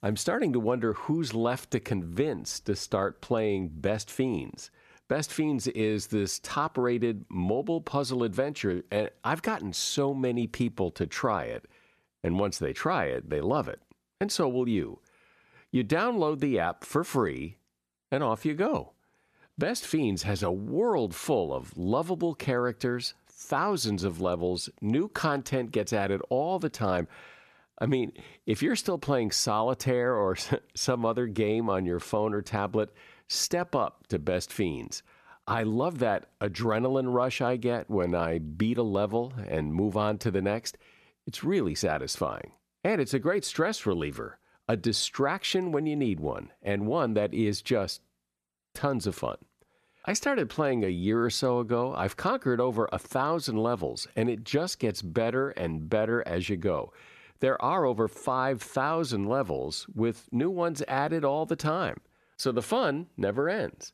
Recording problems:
none

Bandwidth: 14 kHz